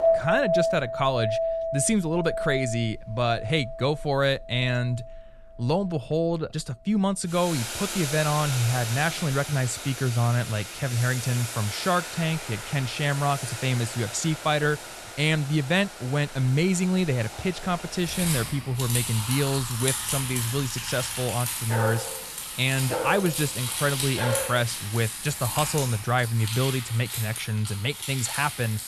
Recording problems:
household noises; loud; throughout; 5 dB below the speech
dog barking; noticeable; from 22 to 25 s; peak 3 dB below the speech

